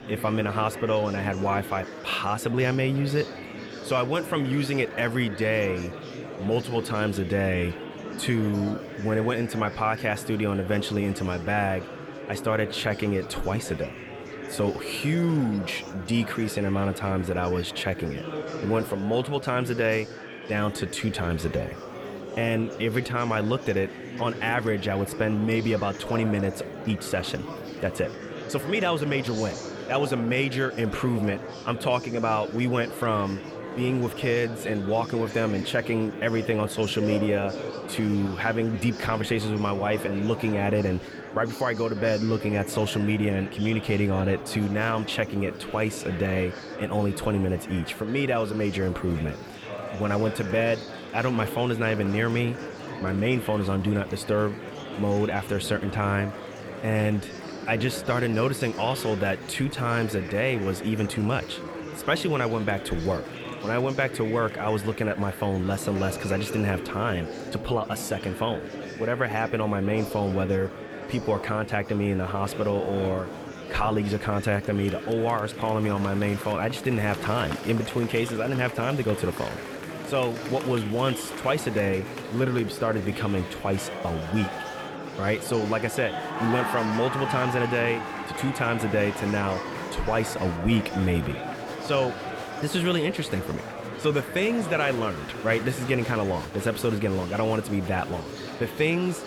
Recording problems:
murmuring crowd; loud; throughout; 9 dB below the speech

